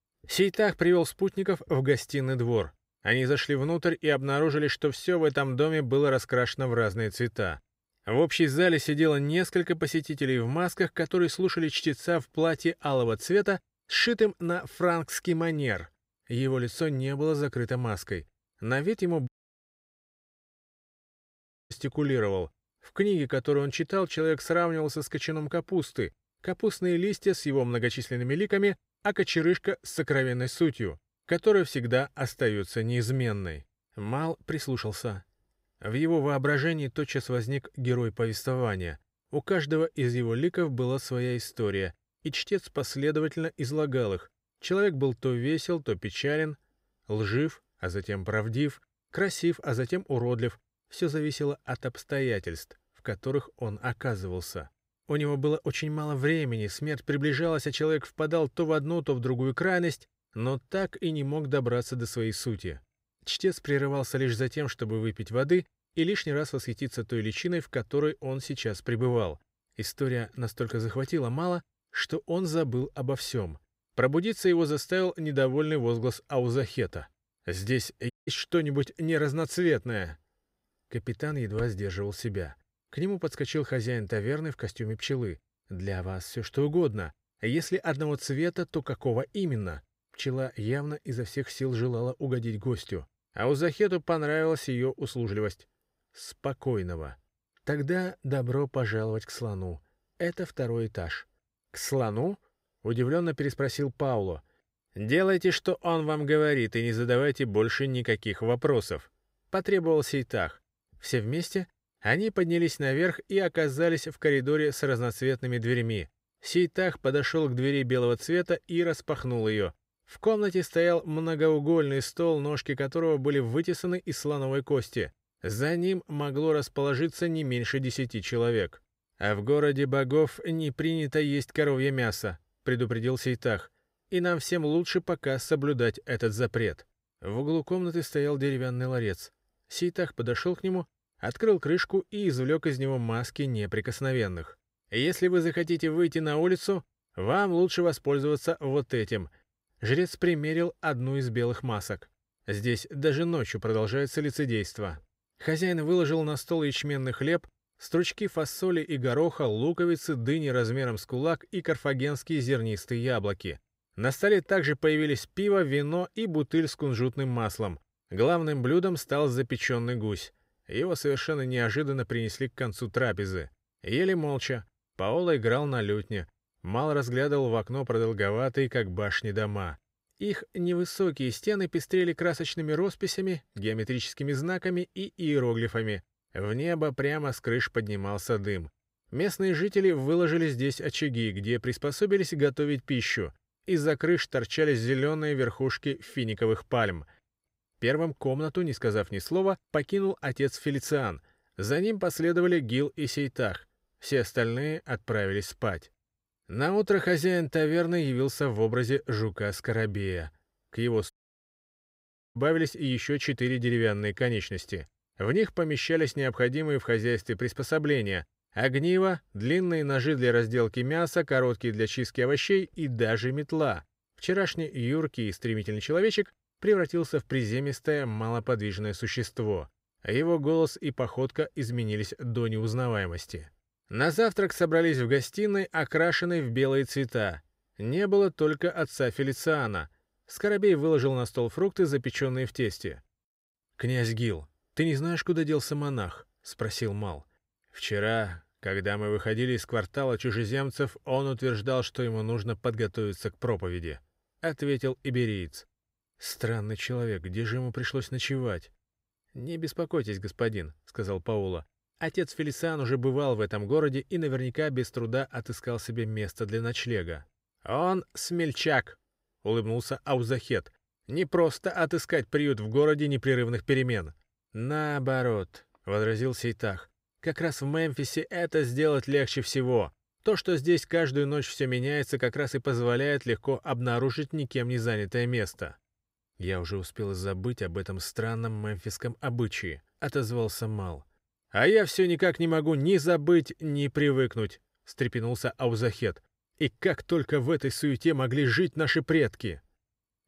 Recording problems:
audio cutting out; at 19 s for 2.5 s, at 1:18 and at 3:31 for 1.5 s

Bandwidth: 15.5 kHz